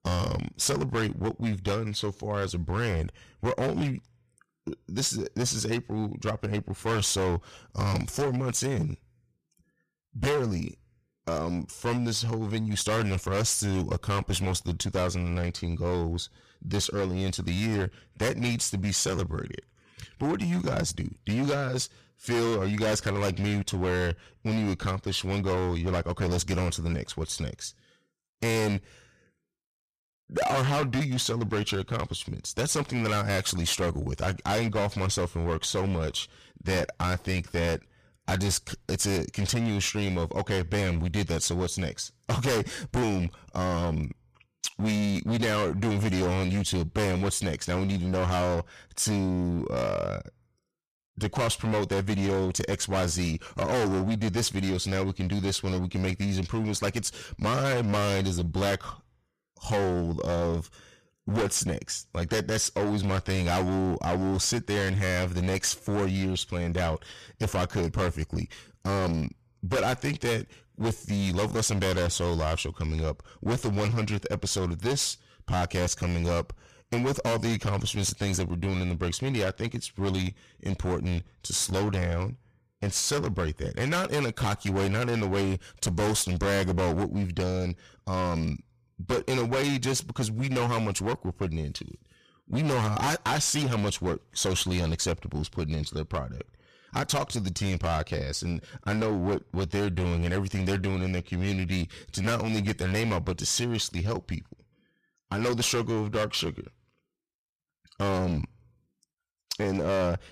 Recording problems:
distortion; heavy; 18% of the sound clipped

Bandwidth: 14.5 kHz